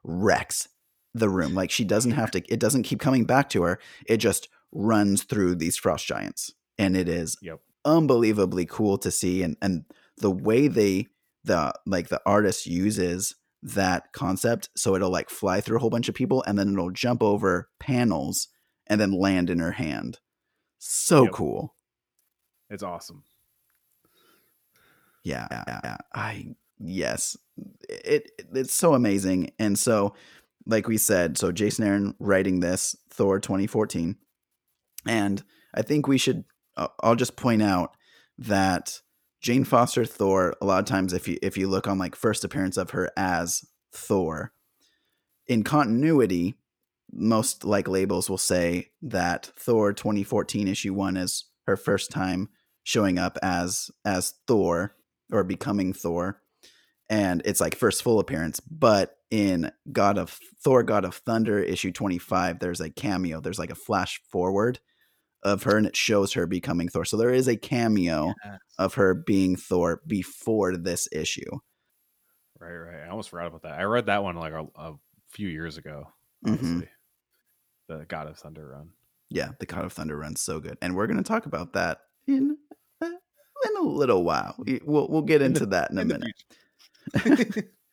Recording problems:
audio stuttering; at 25 s

